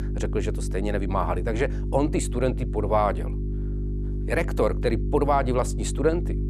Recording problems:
electrical hum; noticeable; throughout; 50 Hz, 15 dB below the speech

